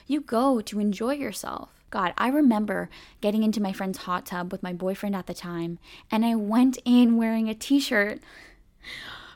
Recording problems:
none

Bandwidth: 17.5 kHz